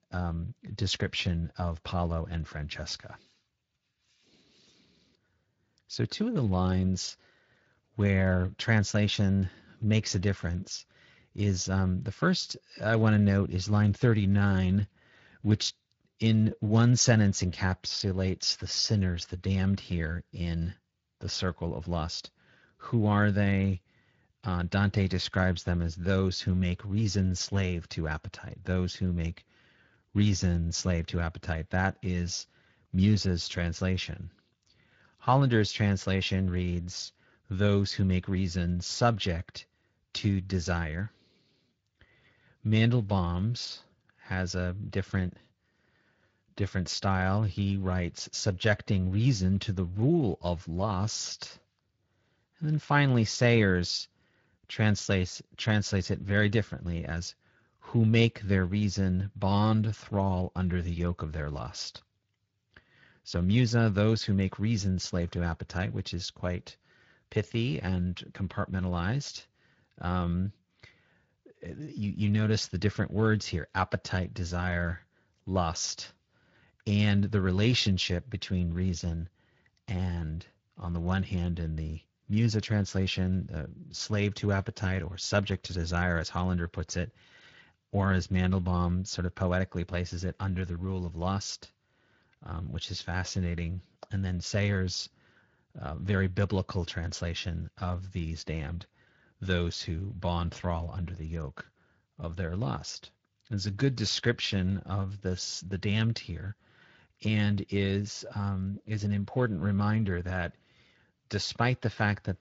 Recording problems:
high frequencies cut off; noticeable; nothing above 7 kHz
garbled, watery; slightly

